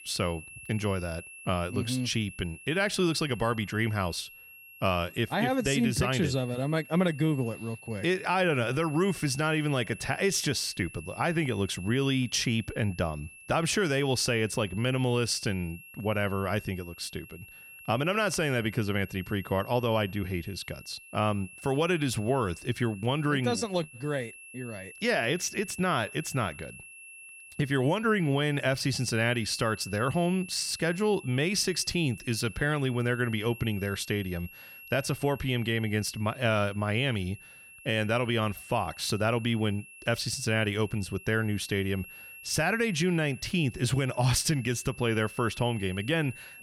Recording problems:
high-pitched whine; noticeable; throughout; 2.5 kHz, 15 dB below the speech

